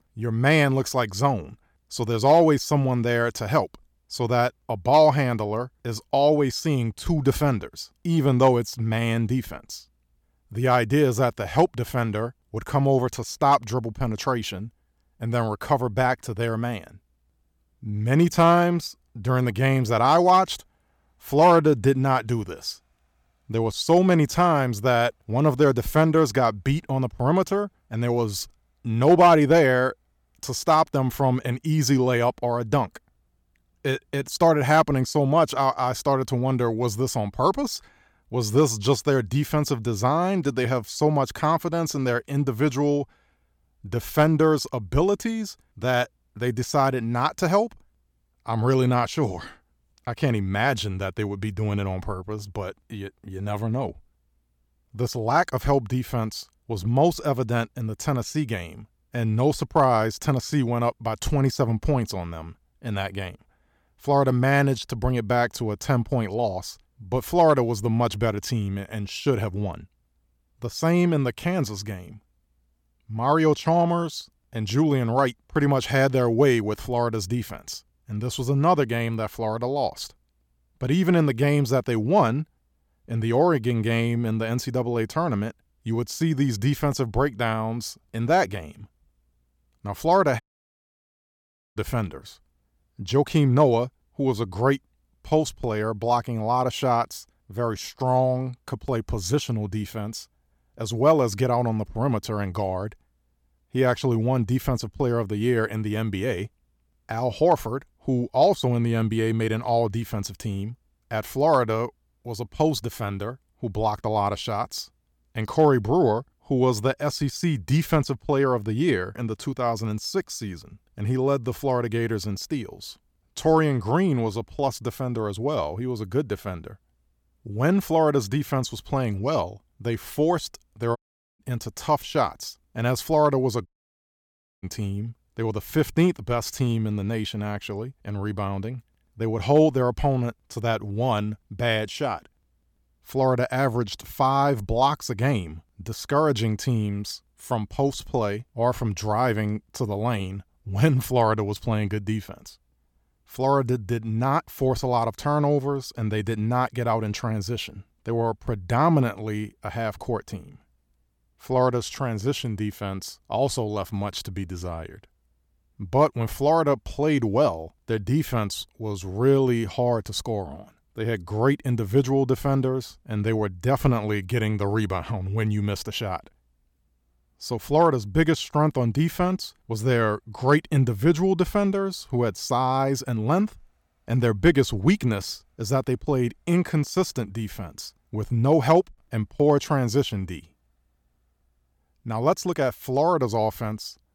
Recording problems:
audio cutting out; at 1:30 for 1.5 s, at 2:11 and at 2:14 for 1 s

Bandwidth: 18 kHz